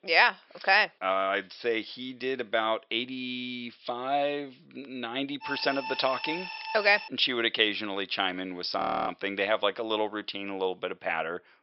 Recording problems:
thin; somewhat; fading below 500 Hz
high frequencies cut off; noticeable; nothing above 5.5 kHz
alarm; noticeable; from 5.5 to 7 s; peak 8 dB below the speech
audio freezing; at 9 s

